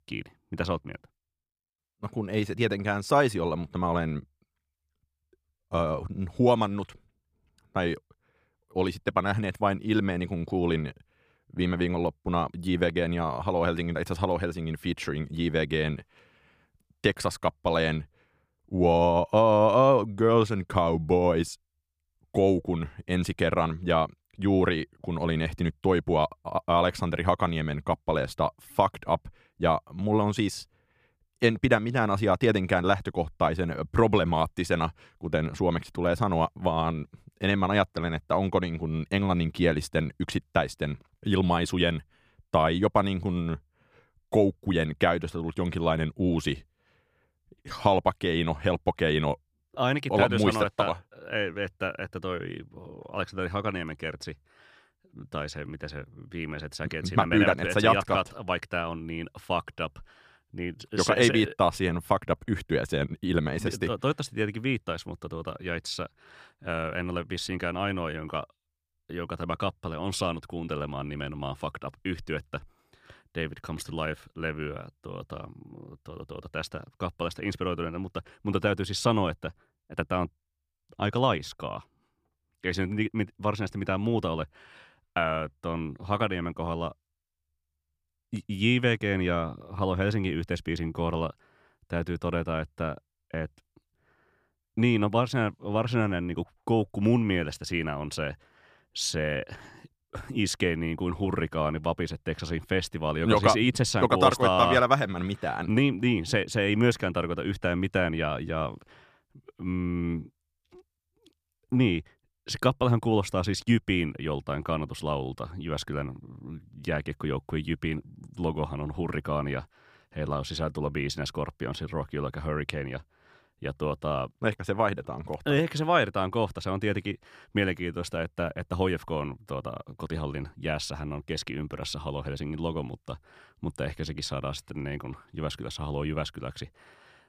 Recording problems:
none

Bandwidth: 15 kHz